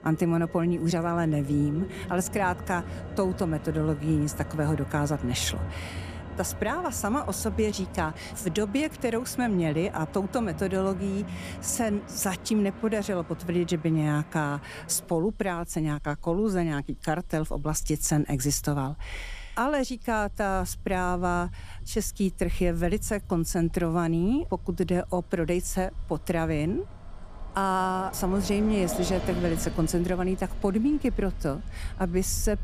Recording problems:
traffic noise; noticeable; throughout; 10 dB below the speech

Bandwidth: 14.5 kHz